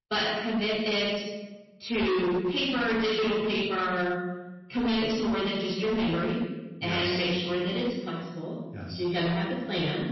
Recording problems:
distortion; heavy; 20% of the sound clipped
room echo; strong; dies away in 1.1 s
off-mic speech; far
garbled, watery; slightly; nothing above 5.5 kHz

